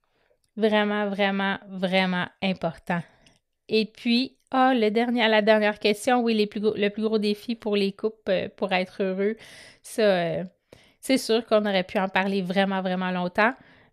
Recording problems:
none

